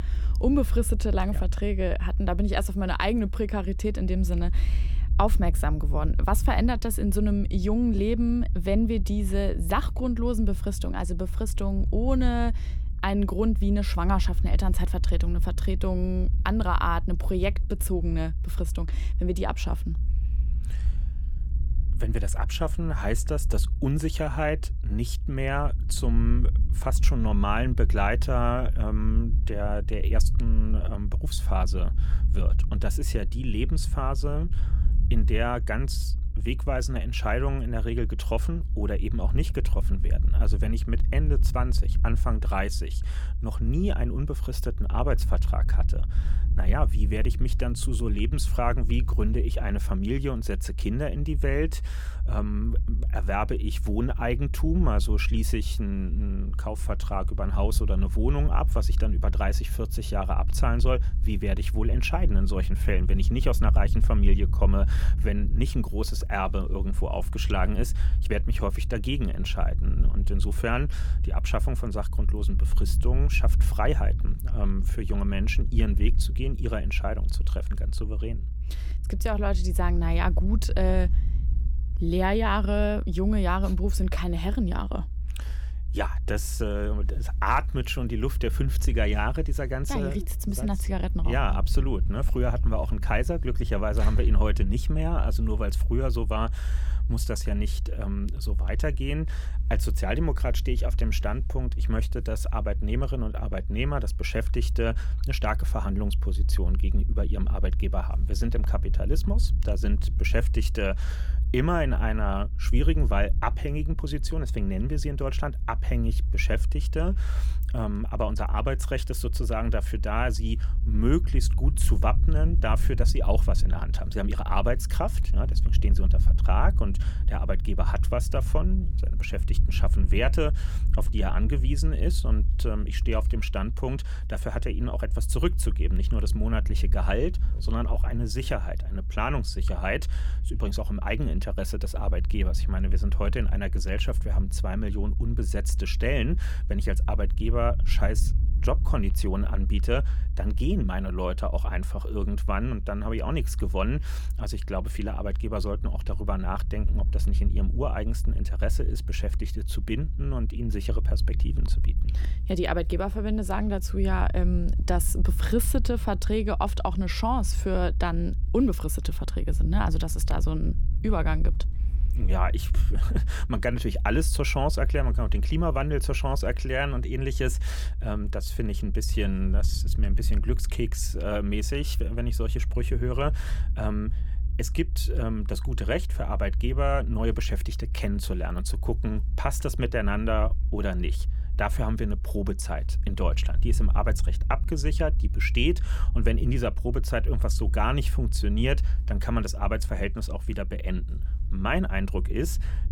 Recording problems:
low rumble; noticeable; throughout; 15 dB below the speech

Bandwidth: 17.5 kHz